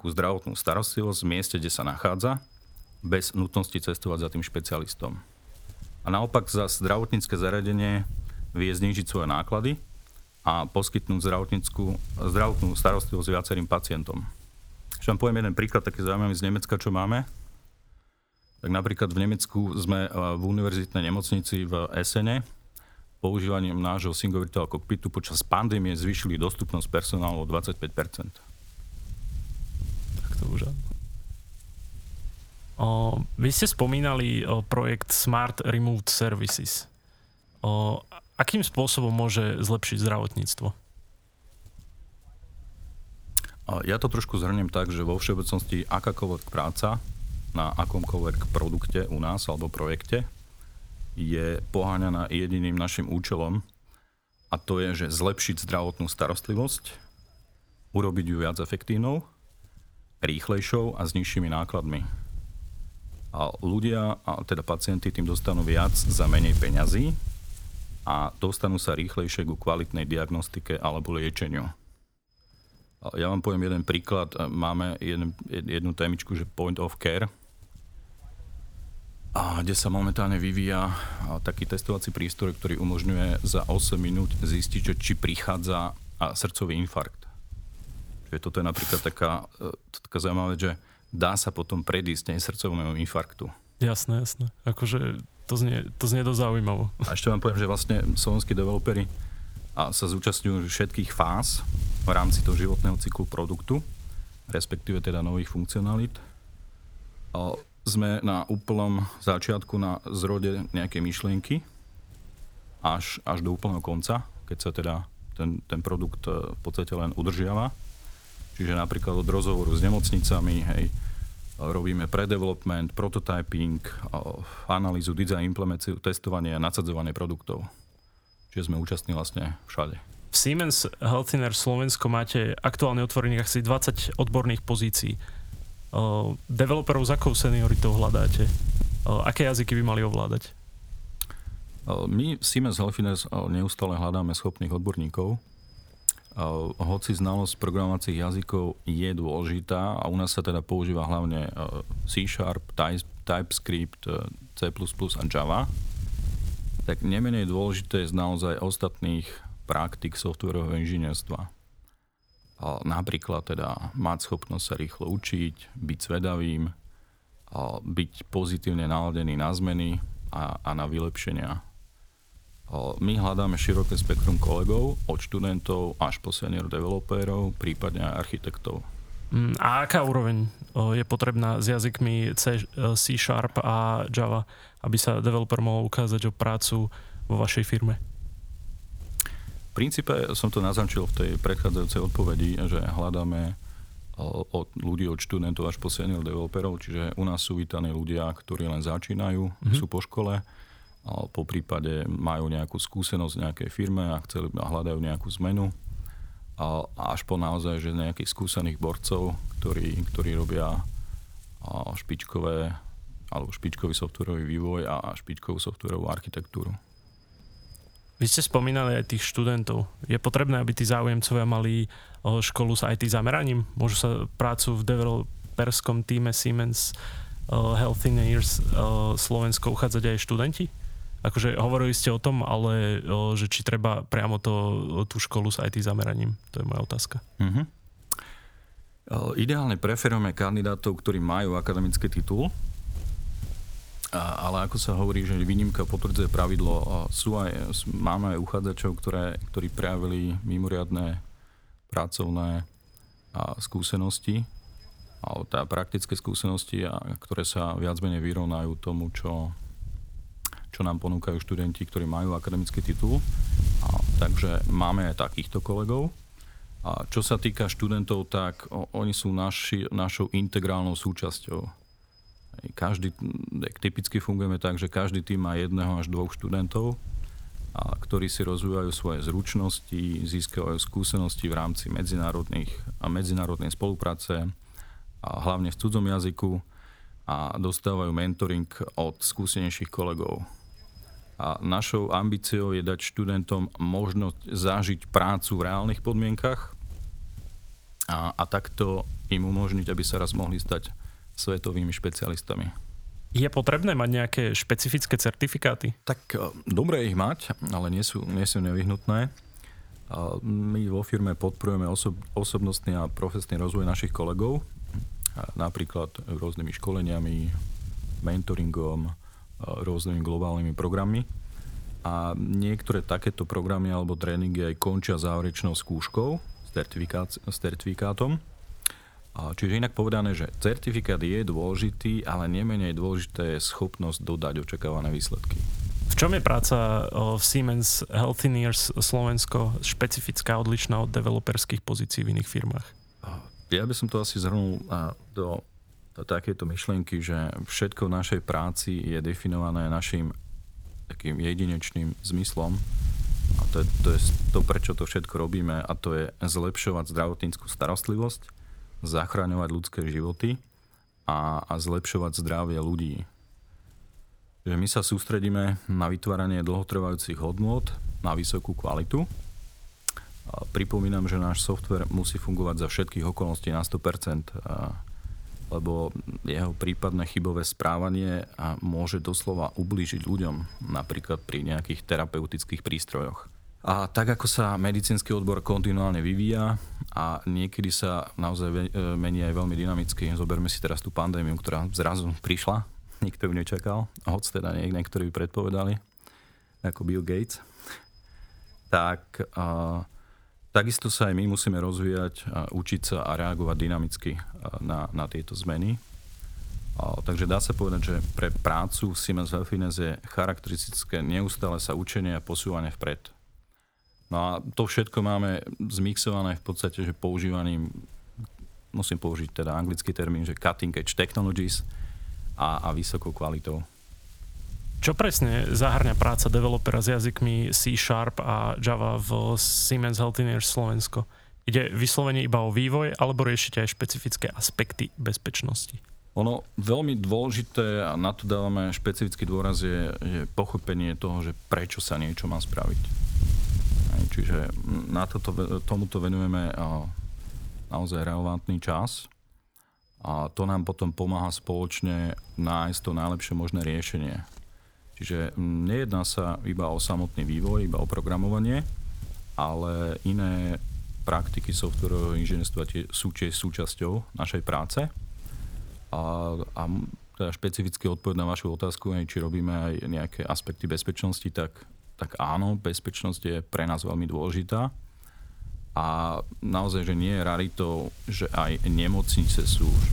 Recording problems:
wind noise on the microphone; occasional gusts; 20 dB below the speech

